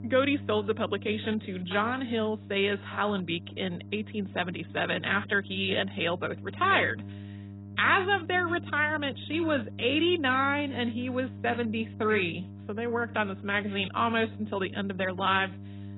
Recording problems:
garbled, watery; badly; nothing above 4 kHz
electrical hum; faint; throughout; 50 Hz, 25 dB below the speech

